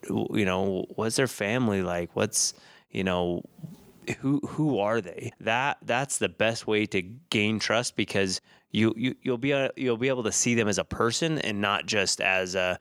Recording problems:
none

